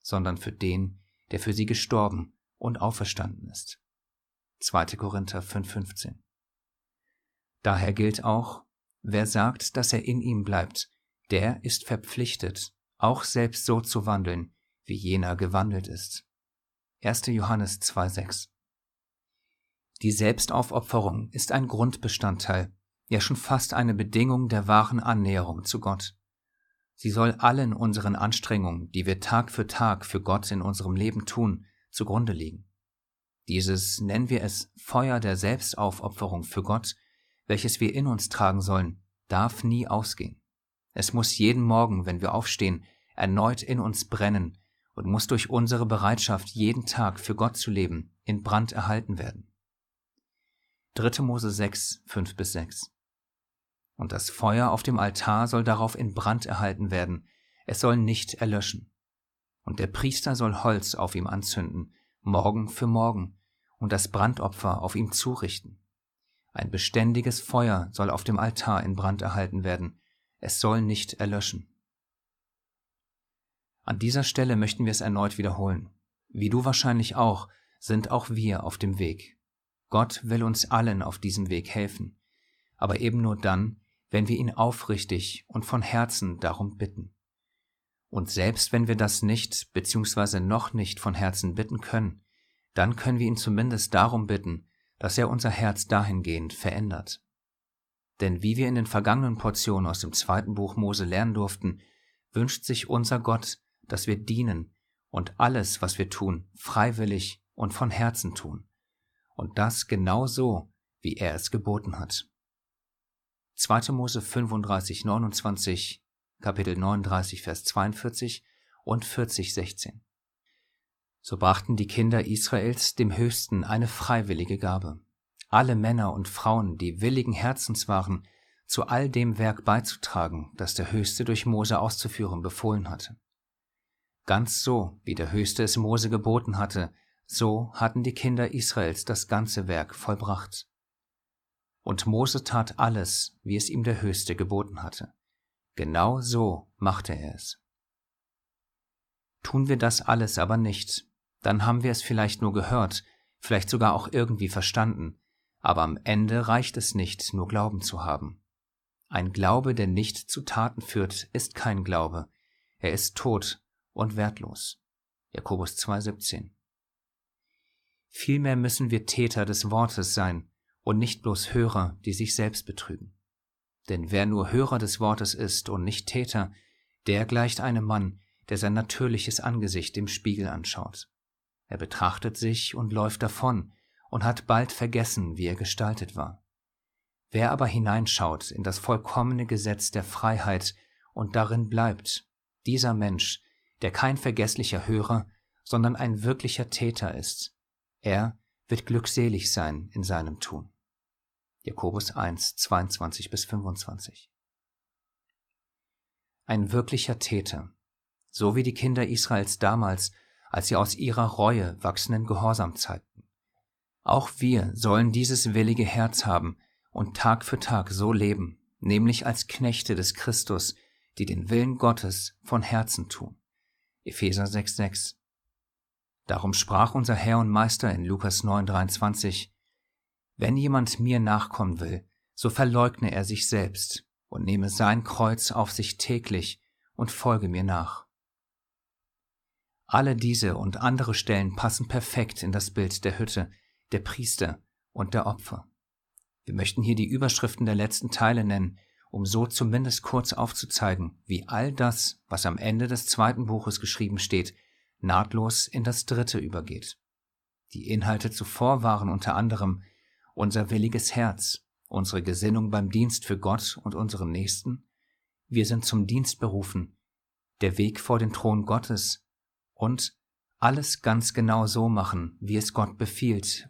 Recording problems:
none

